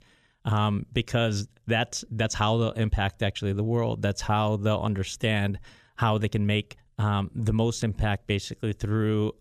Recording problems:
none

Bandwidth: 14.5 kHz